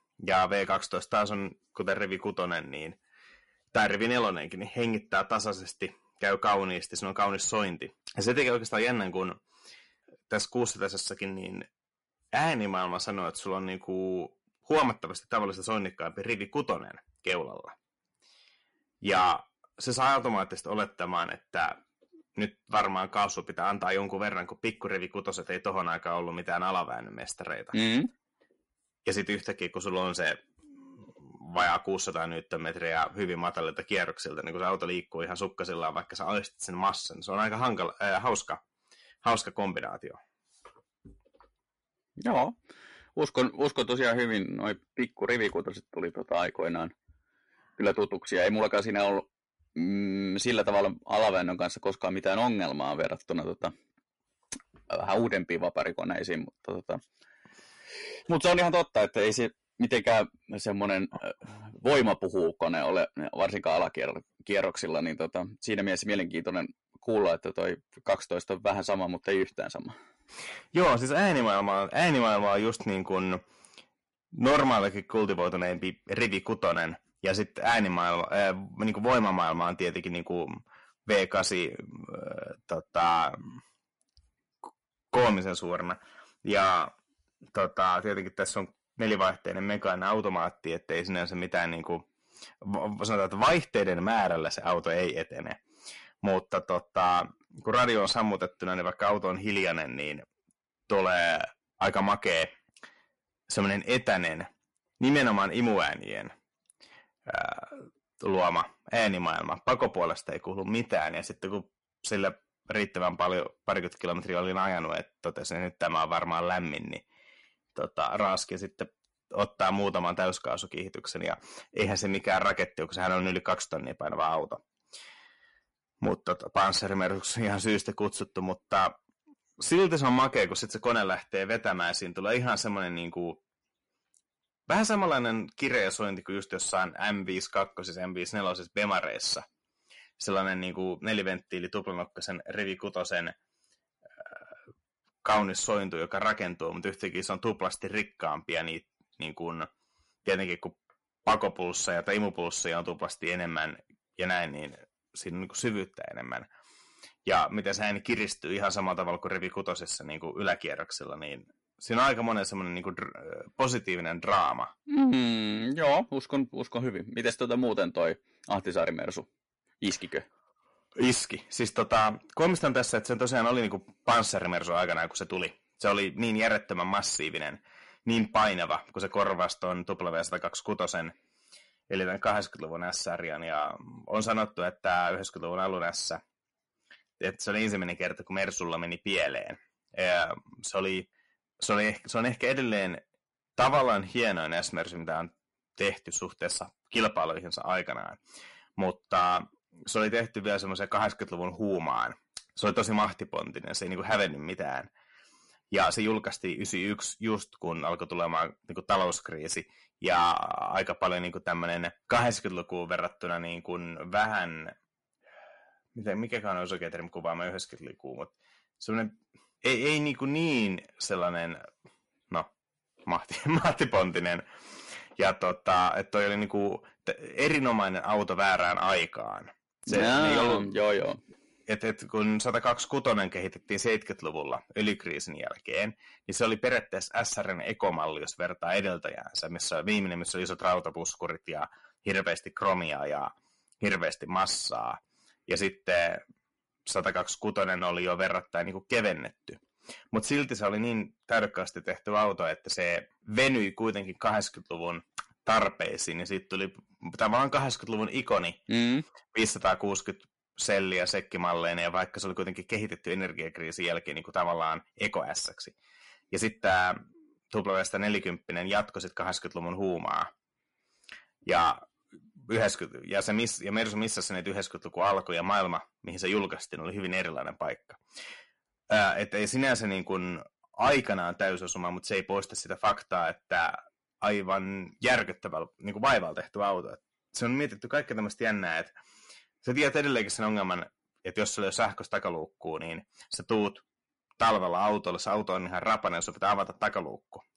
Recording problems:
distortion; heavy; 6 dB below the speech
garbled, watery; slightly; nothing above 10.5 kHz

